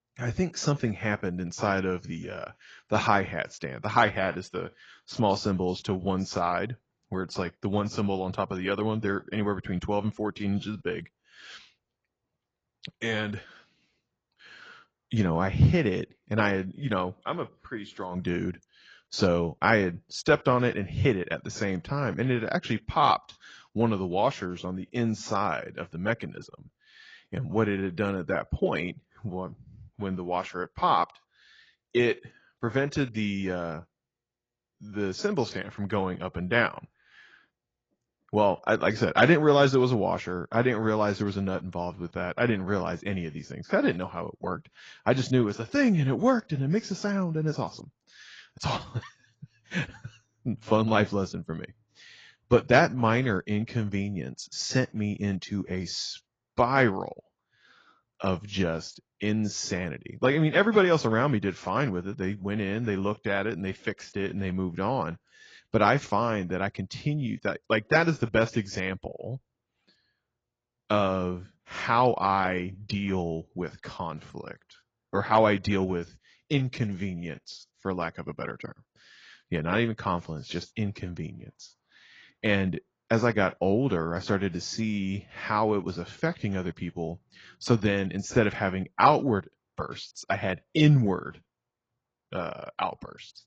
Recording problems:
garbled, watery; badly

